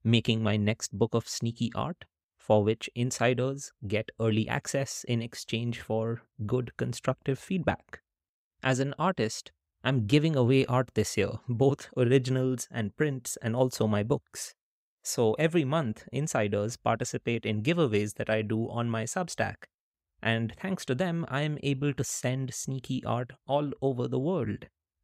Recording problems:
none

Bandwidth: 15.5 kHz